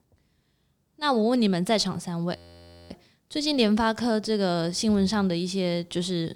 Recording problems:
audio freezing; at 2.5 s for 0.5 s

